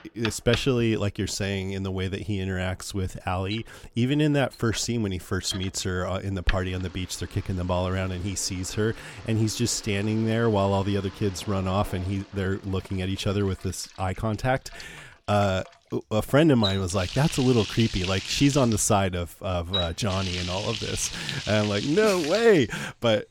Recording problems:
household noises; loud; throughout; 9 dB below the speech

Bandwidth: 17.5 kHz